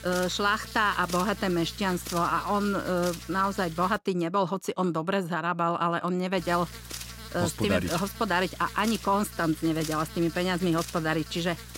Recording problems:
electrical hum; noticeable; until 4 s and from 6.5 s on; 60 Hz, 15 dB below the speech

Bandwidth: 16 kHz